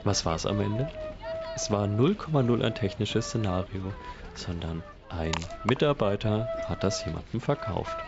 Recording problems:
high frequencies cut off; noticeable; nothing above 8 kHz
household noises; loud; throughout; 10 dB below the speech

